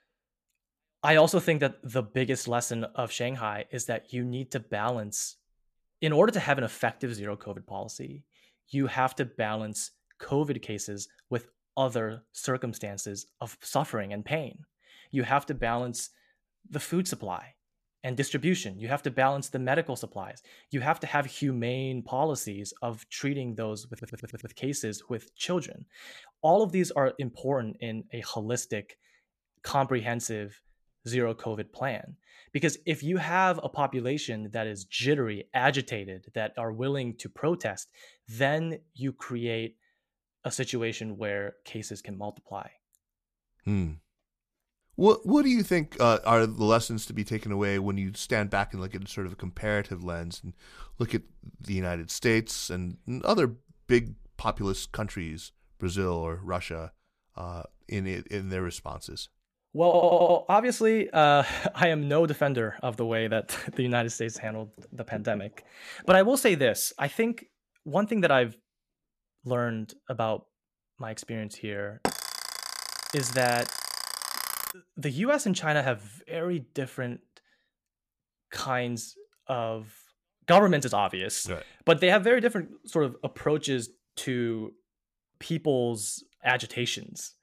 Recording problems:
audio stuttering; at 24 s and at 1:00
alarm; noticeable; from 1:12 to 1:15; peak 3 dB below the speech

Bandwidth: 14.5 kHz